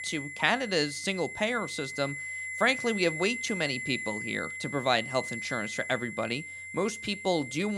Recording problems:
high-pitched whine; loud; throughout; 2 kHz, 6 dB below the speech
abrupt cut into speech; at the end

